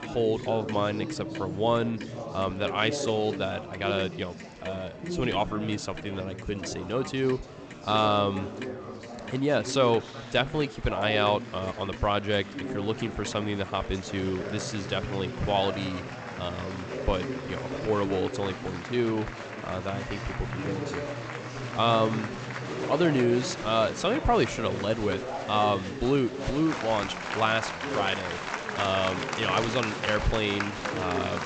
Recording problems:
garbled, watery; slightly; nothing above 8 kHz
chatter from many people; loud; throughout; 6 dB below the speech
household noises; faint; throughout; 20 dB below the speech

